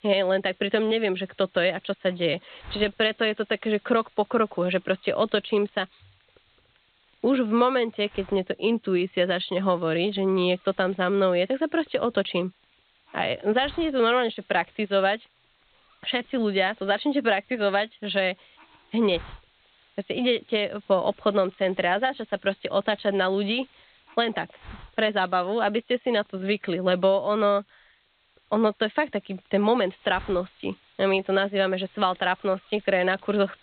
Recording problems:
high frequencies cut off; severe; nothing above 4 kHz
hiss; faint; throughout; 30 dB below the speech

